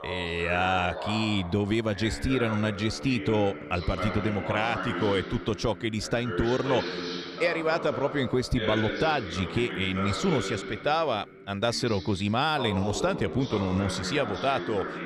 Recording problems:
voice in the background; loud; throughout; 7 dB below the speech

